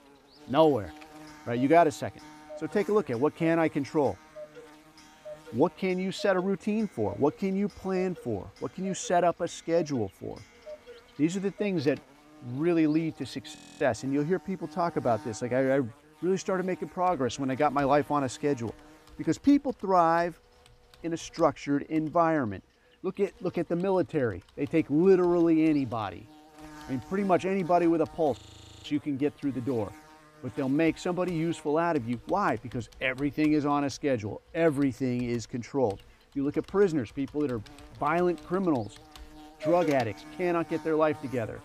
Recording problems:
electrical hum; faint; throughout; 50 Hz, 25 dB below the speech
household noises; faint; throughout; 20 dB below the speech
audio freezing; at 14 s and at 28 s

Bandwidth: 15 kHz